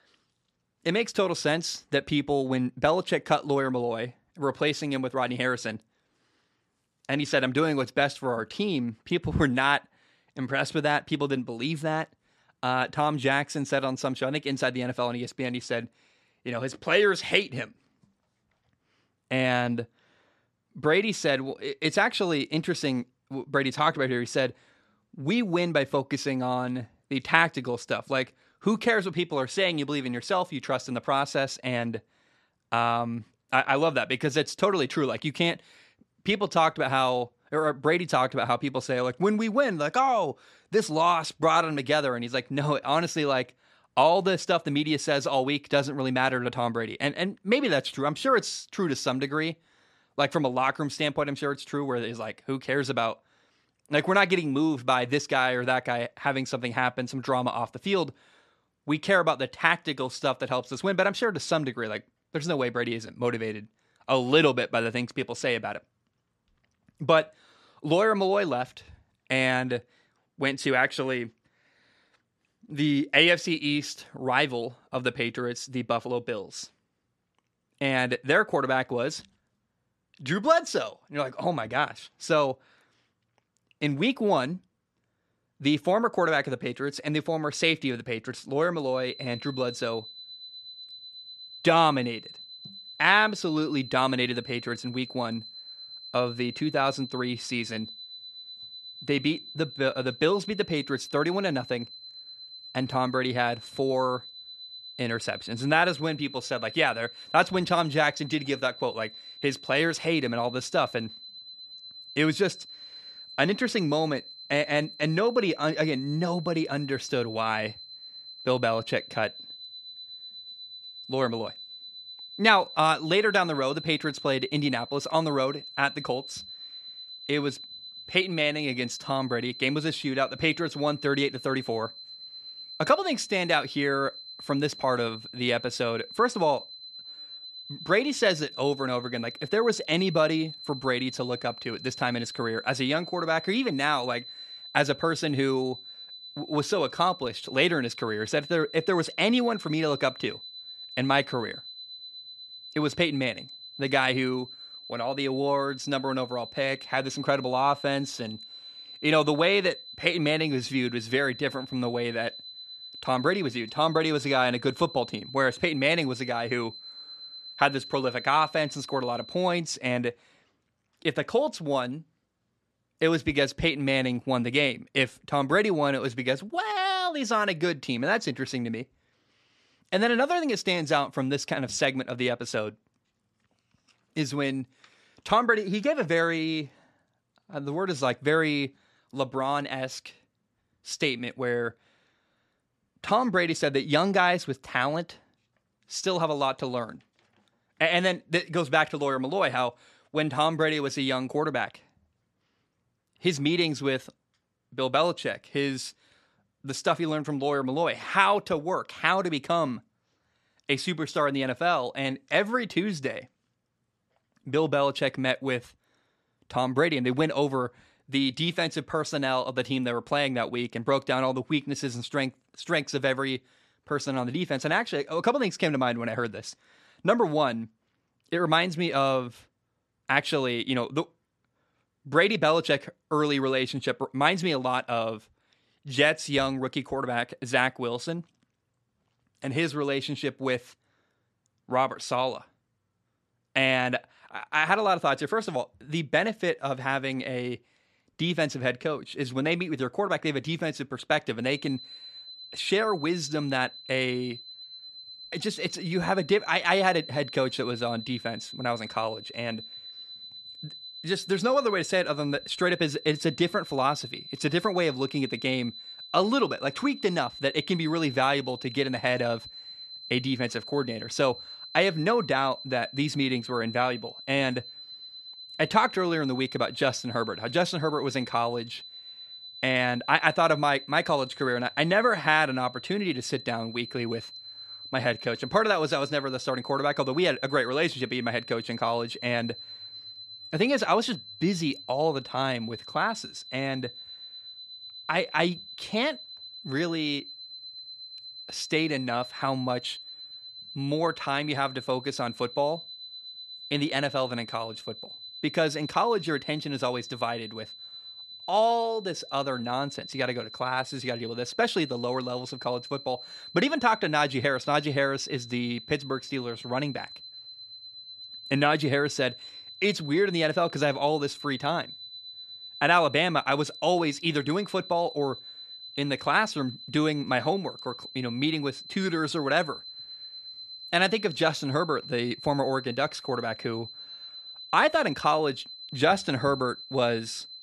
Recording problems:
high-pitched whine; noticeable; from 1:29 to 2:49 and from 4:12 on; 4 kHz, 15 dB below the speech

